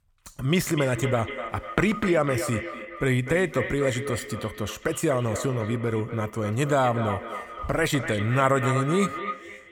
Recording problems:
echo of what is said; strong; throughout; 250 ms later, 8 dB below the speech

